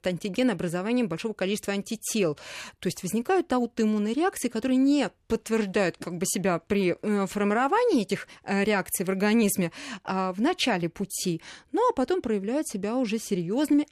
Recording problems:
none

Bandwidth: 14.5 kHz